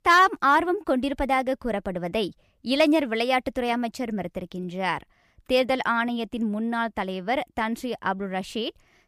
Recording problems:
none

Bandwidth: 15 kHz